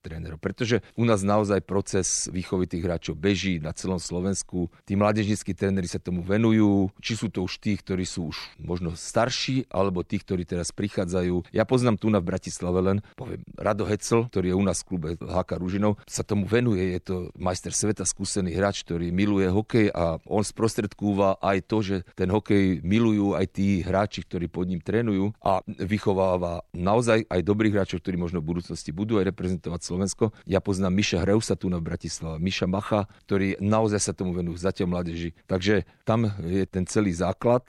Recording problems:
none

